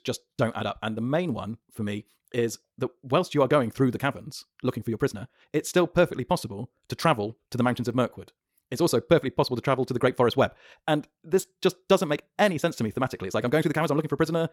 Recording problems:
wrong speed, natural pitch; too fast; 1.7 times normal speed

